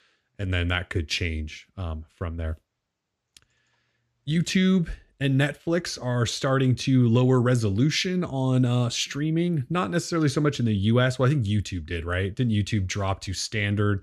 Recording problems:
none

